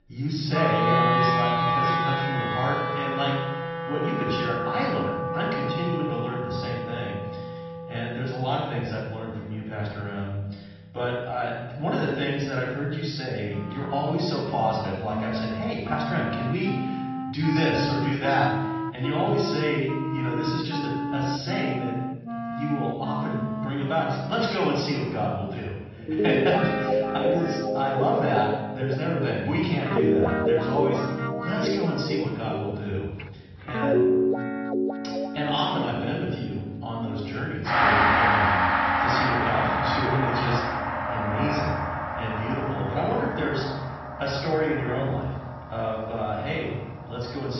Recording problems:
off-mic speech; far
room echo; noticeable; dies away in 1.4 s
high frequencies cut off; noticeable; nothing above 5.5 kHz
garbled, watery; slightly
background music; very loud; throughout; 1 dB above the speech
abrupt cut into speech; at the end

